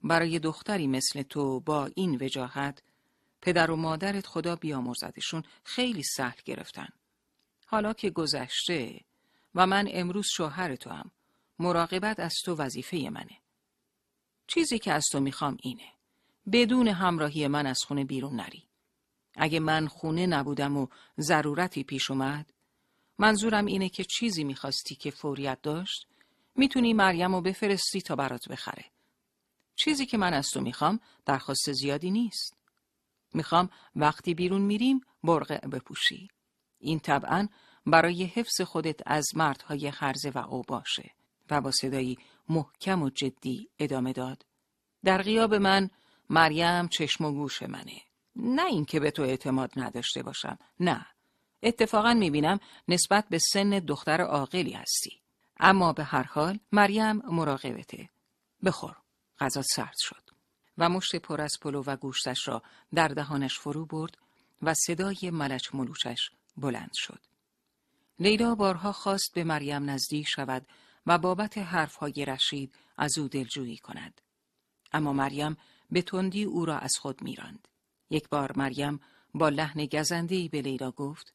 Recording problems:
none

